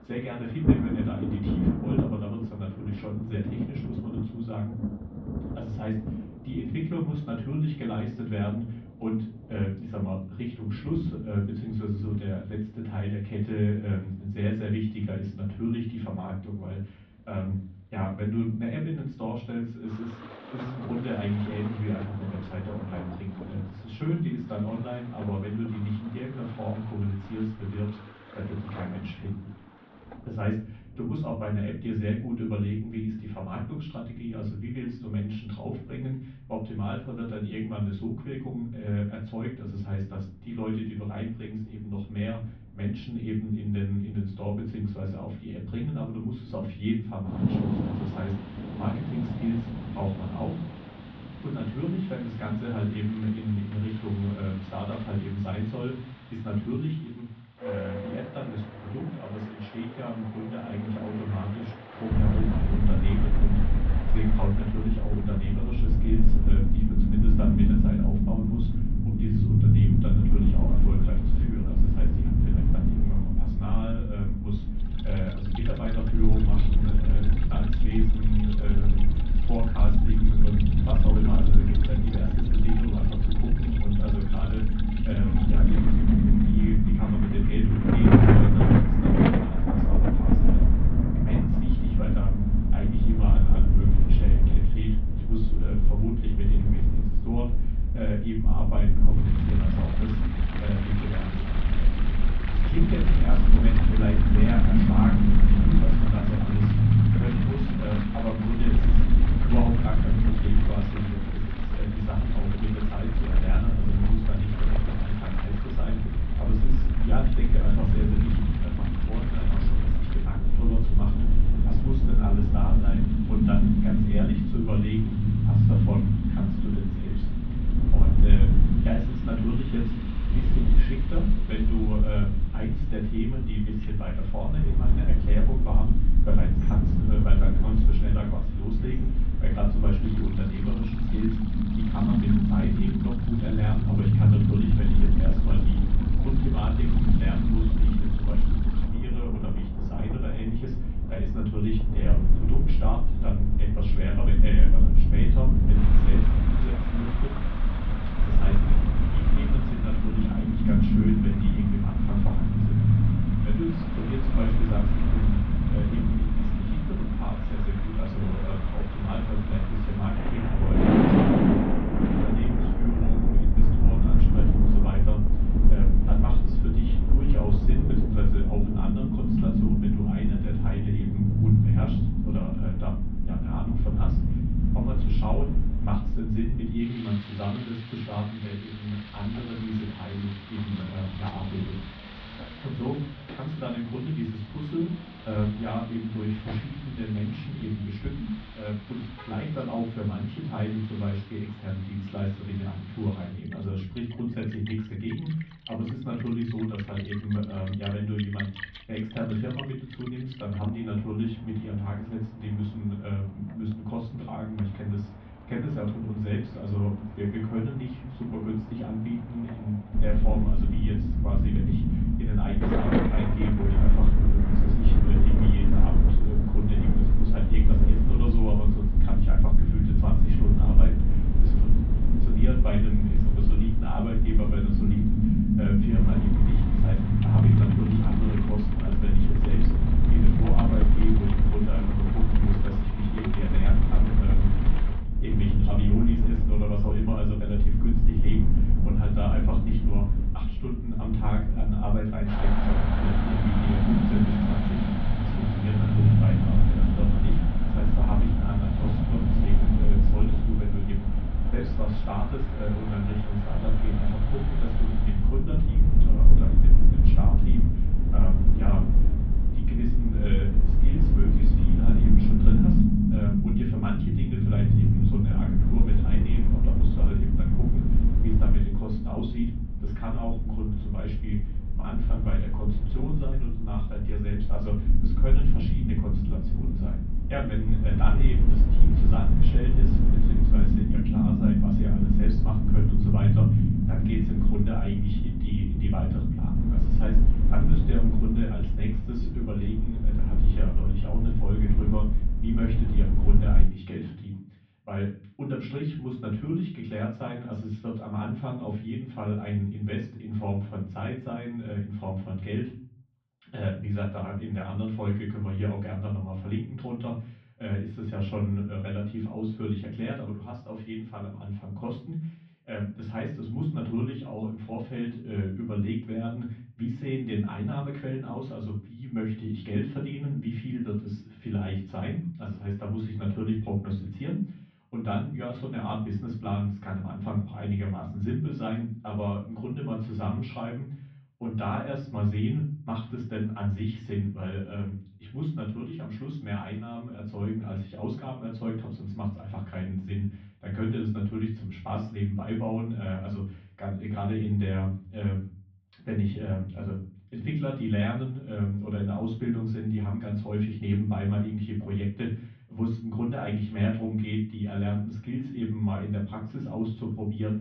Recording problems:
off-mic speech; far
muffled; very; fading above 3.5 kHz
room echo; slight; dies away in 0.4 s
low rumble; very loud; from 1:02 to 3:07 and from 3:40 to 5:04; as loud as the speech
rain or running water; loud; until 4:25; 3 dB below the speech

